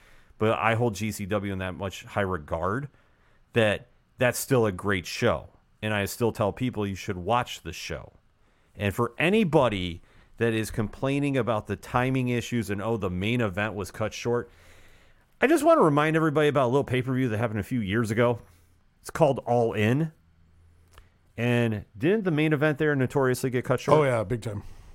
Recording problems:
none

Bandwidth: 16 kHz